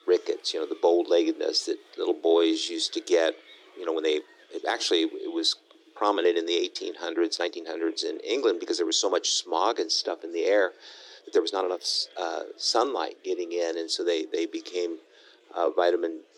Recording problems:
thin; very; fading below 300 Hz
murmuring crowd; faint; throughout; 30 dB below the speech
uneven, jittery; strongly; from 2 to 16 s

